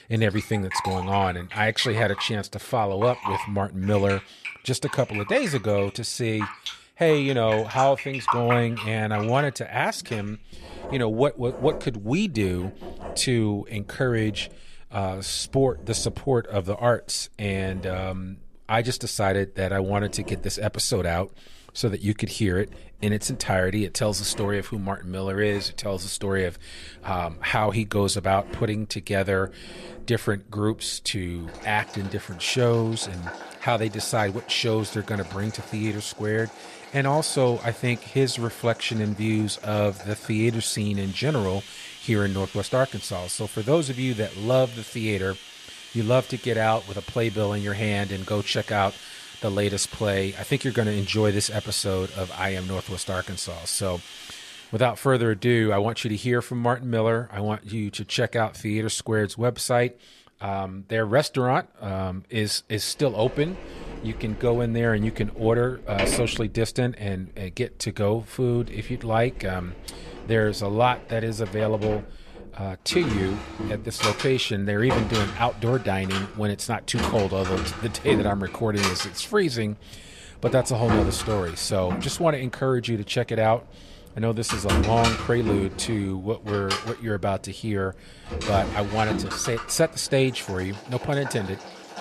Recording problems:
household noises; loud; throughout; 9 dB below the speech

